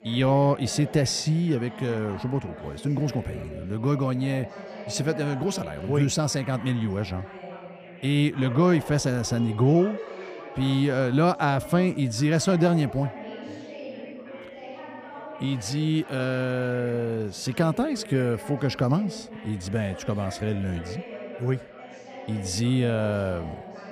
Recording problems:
background chatter; noticeable; throughout; 4 voices, 15 dB below the speech

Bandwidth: 15.5 kHz